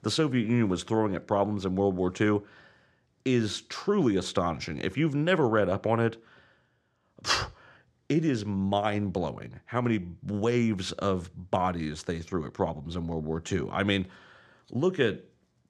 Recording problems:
none

